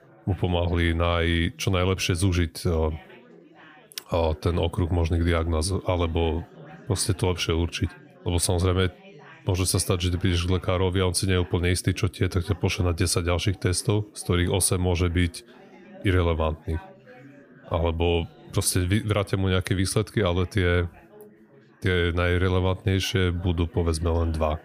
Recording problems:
background chatter; faint; throughout; 4 voices, 25 dB below the speech

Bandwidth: 15 kHz